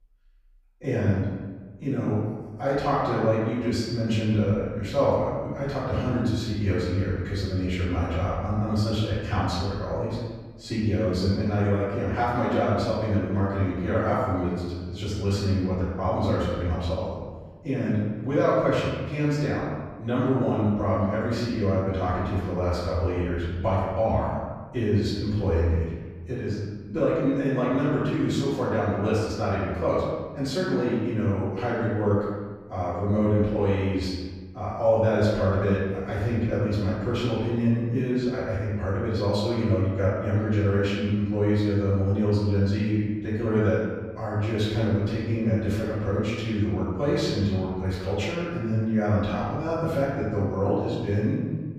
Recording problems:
room echo; strong; dies away in 1.2 s
off-mic speech; far

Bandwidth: 15.5 kHz